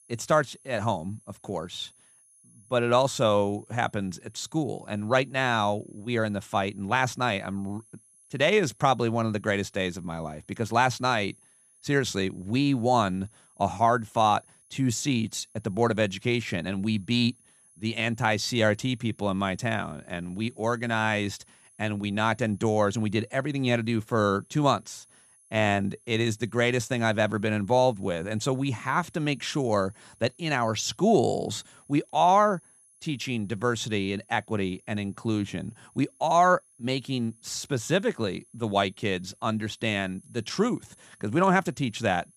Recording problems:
high-pitched whine; faint; throughout; 10.5 kHz, 30 dB below the speech

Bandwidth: 15 kHz